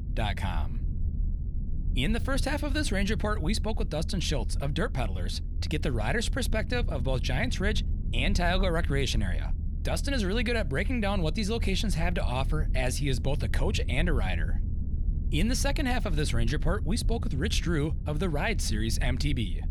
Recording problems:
low rumble; noticeable; throughout; 15 dB below the speech

